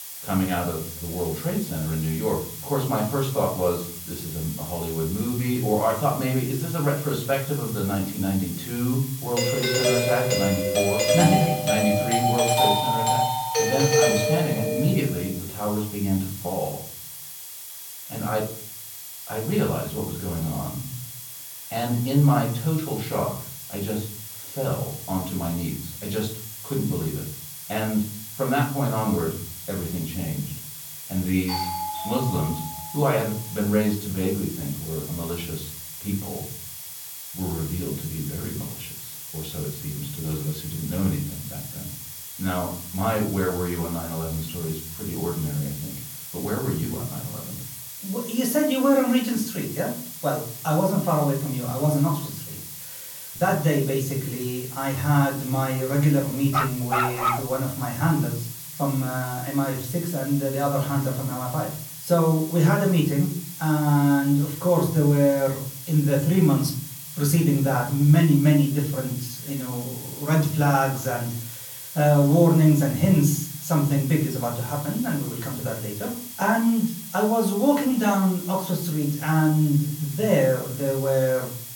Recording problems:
off-mic speech; far
room echo; slight; dies away in 0.5 s
hiss; noticeable; throughout; 10 dB below the speech
high-pitched whine; faint; throughout; 3.5 kHz, 30 dB below the speech
doorbell; loud; from 9.5 to 15 s; peak 5 dB above the speech
doorbell; noticeable; from 31 to 33 s; peak 3 dB below the speech
dog barking; loud; at 57 s; peak 2 dB above the speech

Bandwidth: 17 kHz